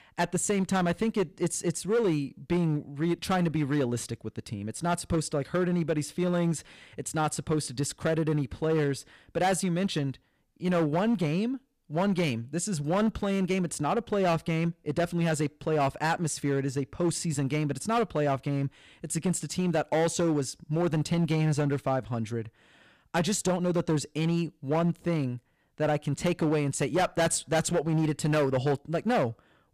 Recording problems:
distortion; slight; 9% of the sound clipped

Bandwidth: 15 kHz